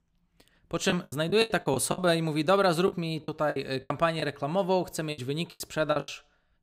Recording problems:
choppy; very; 15% of the speech affected

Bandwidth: 15.5 kHz